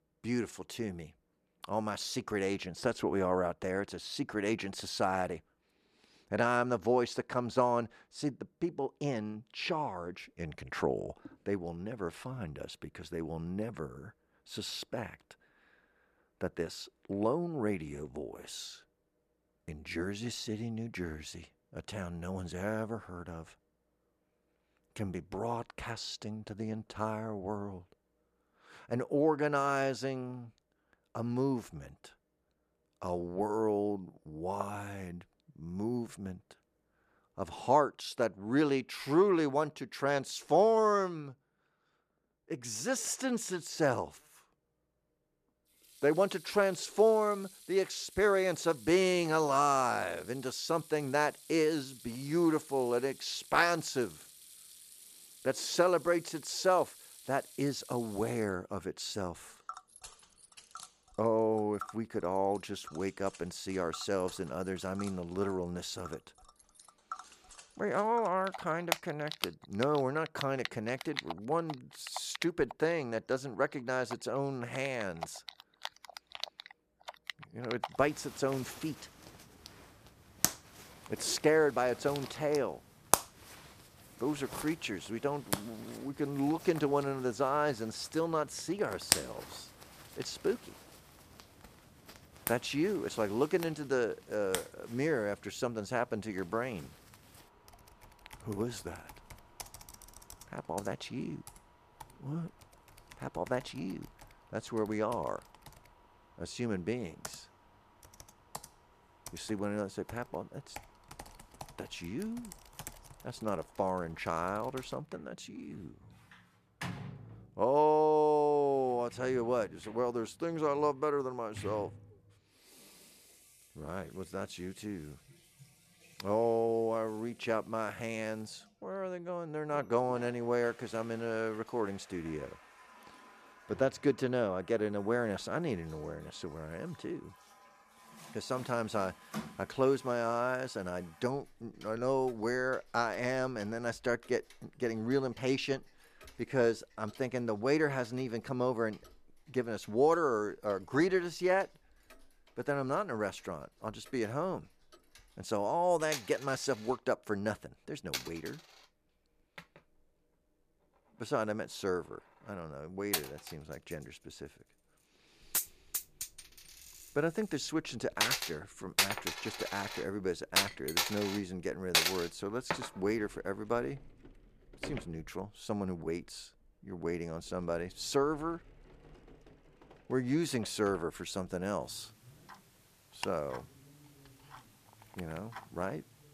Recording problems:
household noises; loud; from 46 s on; 7 dB below the speech

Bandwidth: 14.5 kHz